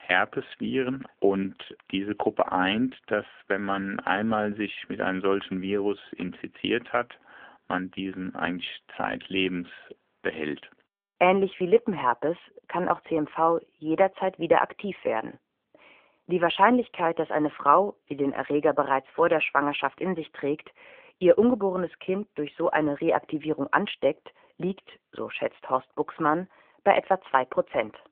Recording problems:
phone-call audio; nothing above 3.5 kHz

